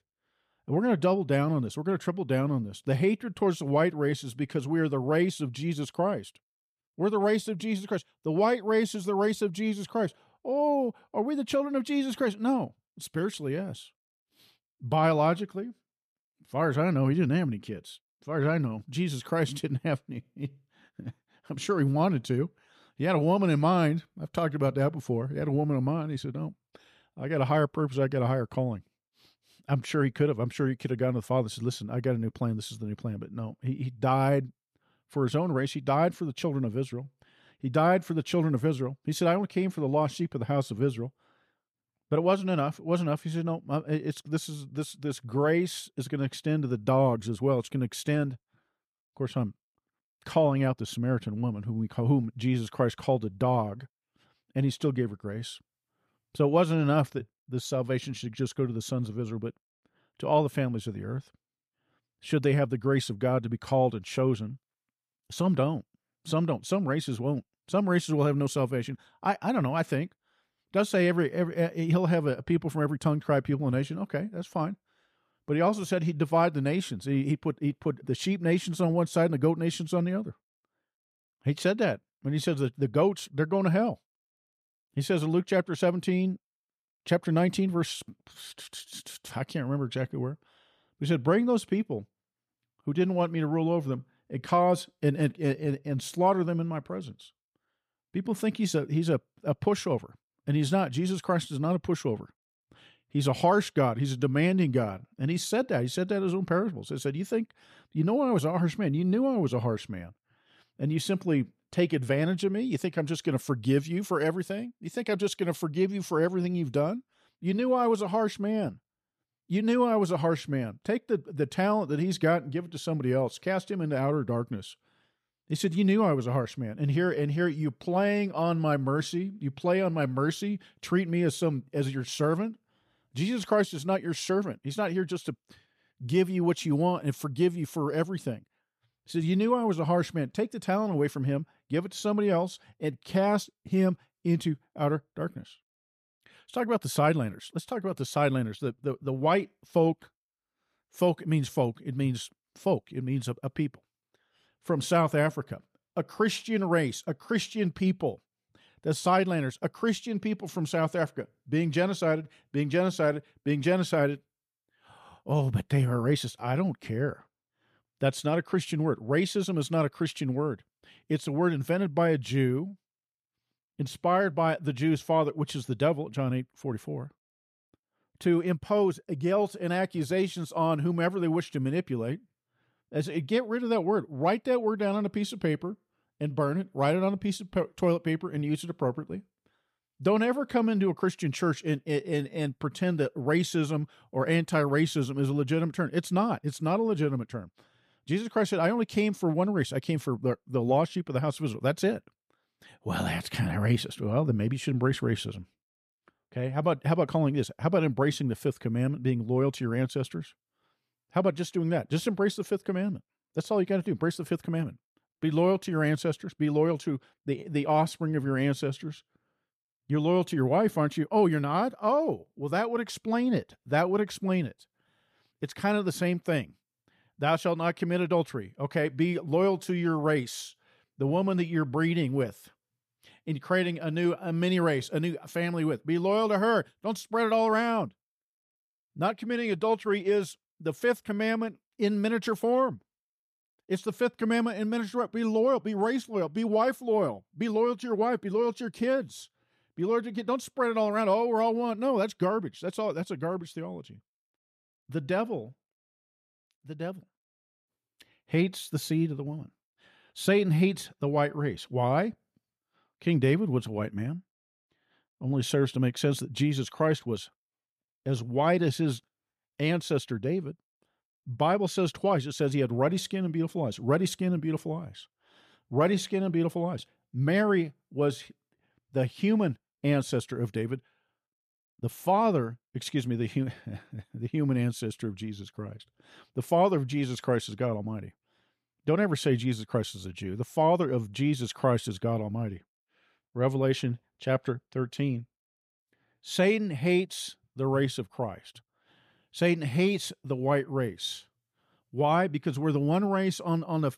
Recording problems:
none

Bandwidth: 14.5 kHz